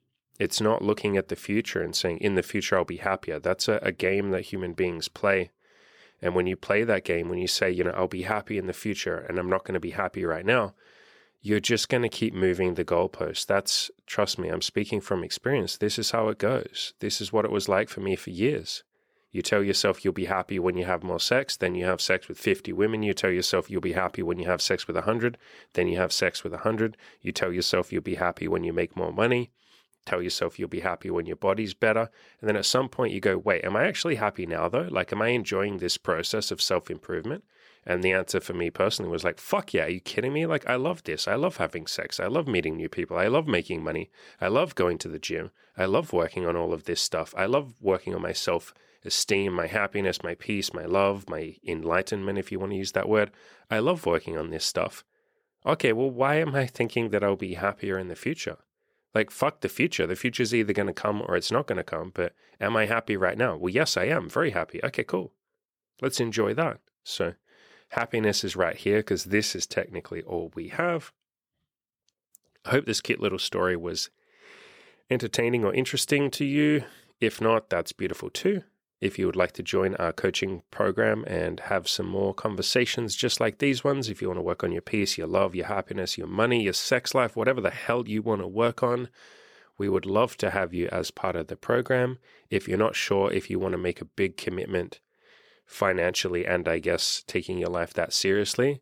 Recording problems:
none

